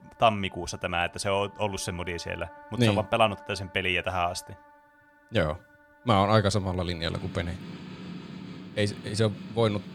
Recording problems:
background music; noticeable; throughout; 20 dB below the speech

